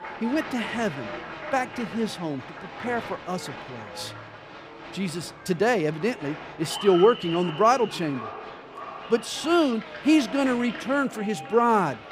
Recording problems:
echo of what is said; faint; throughout; 540 ms later, 20 dB below the speech
crowd noise; noticeable; throughout; 15 dB below the speech
background chatter; faint; throughout; 2 voices, 30 dB below the speech

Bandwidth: 15.5 kHz